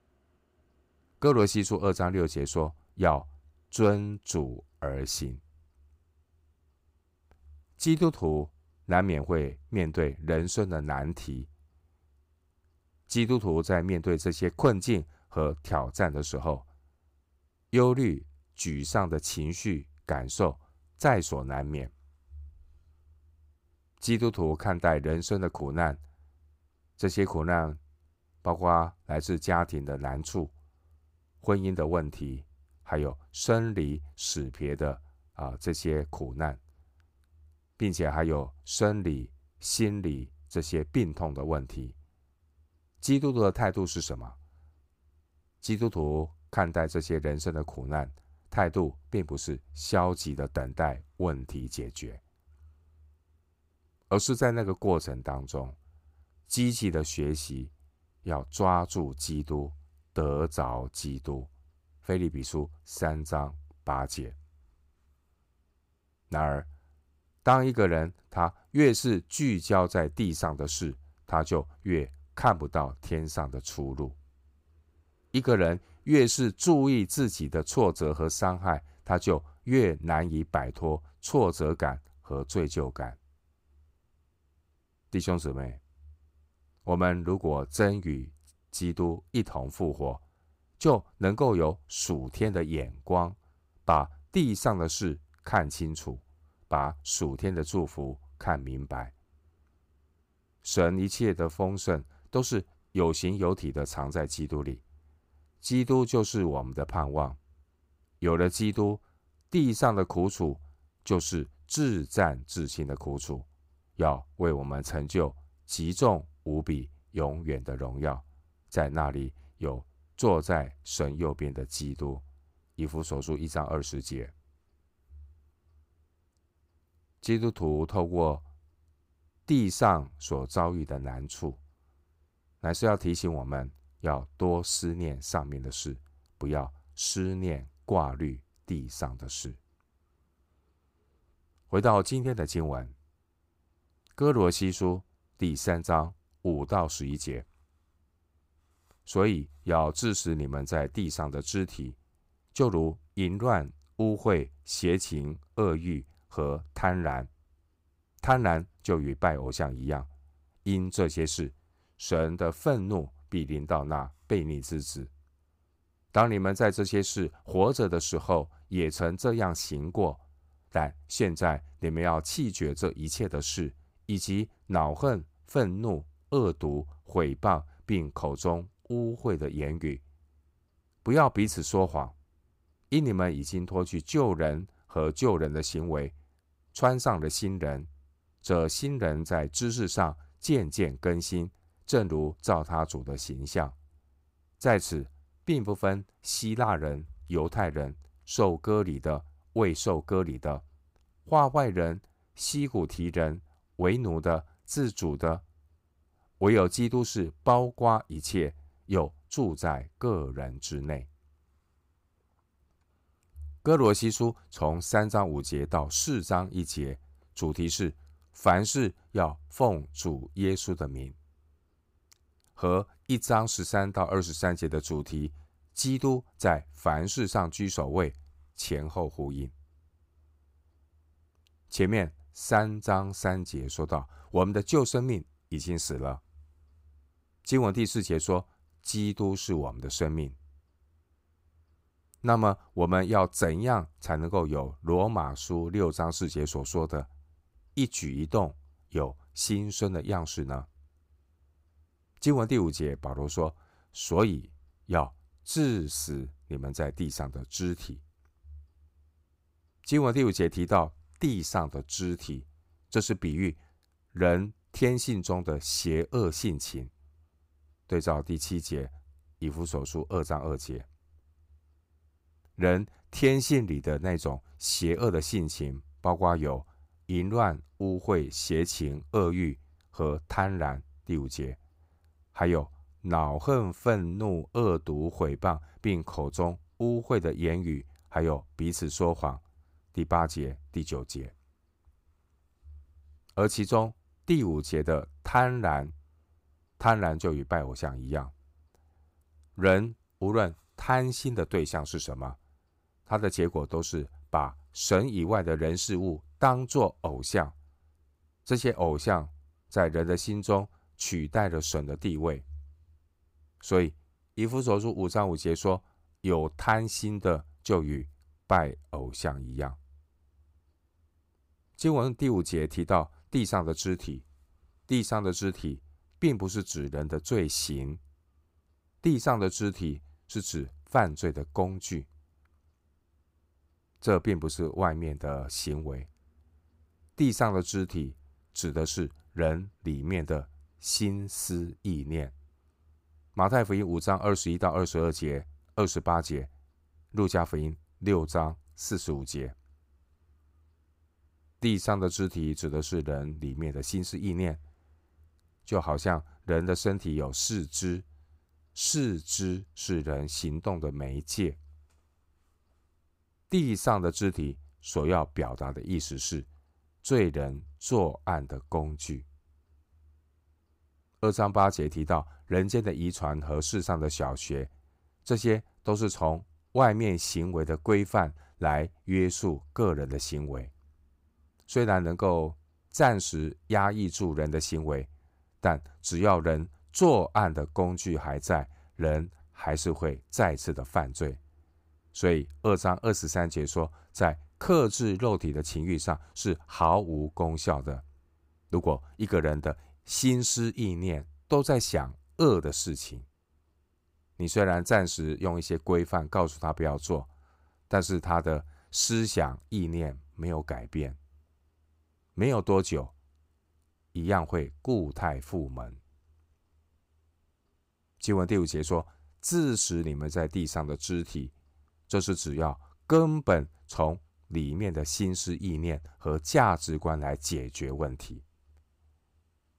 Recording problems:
none

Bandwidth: 15.5 kHz